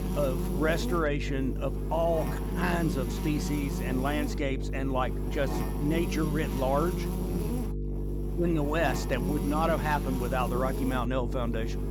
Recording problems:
electrical hum; loud; throughout; 50 Hz, 8 dB below the speech

